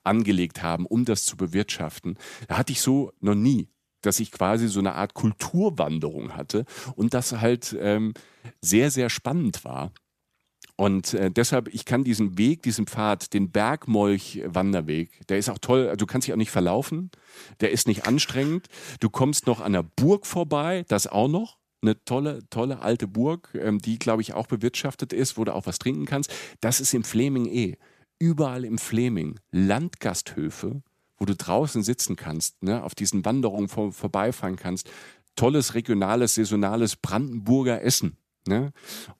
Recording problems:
none

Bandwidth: 14.5 kHz